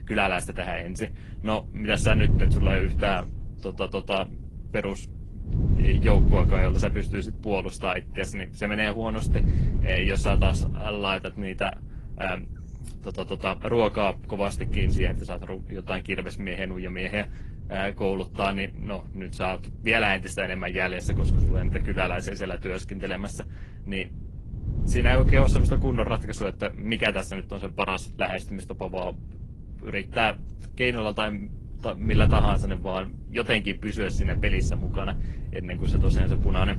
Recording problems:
garbled, watery; slightly; nothing above 11 kHz
wind noise on the microphone; occasional gusts; 10 dB below the speech

